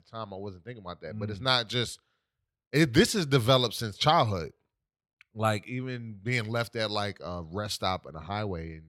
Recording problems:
none

